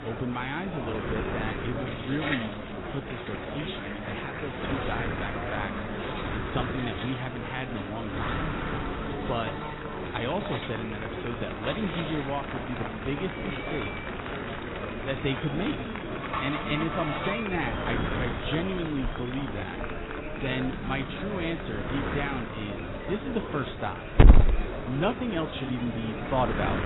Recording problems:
garbled, watery; badly; nothing above 4 kHz
animal sounds; very loud; throughout; 2 dB above the speech
wind noise on the microphone; heavy; 5 dB below the speech
murmuring crowd; loud; throughout; 4 dB below the speech

